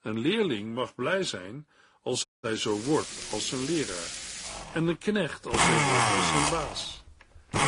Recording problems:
garbled, watery; slightly; nothing above 10.5 kHz
household noises; very loud; from 2.5 s on; 3 dB above the speech
audio cutting out; at 2.5 s

